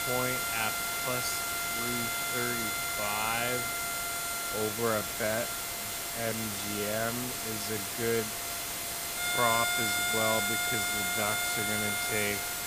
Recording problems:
wrong speed, natural pitch; too slow; 0.5 times normal speed
background music; very loud; throughout; 2 dB above the speech
hiss; very loud; throughout; 1 dB above the speech

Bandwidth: 15 kHz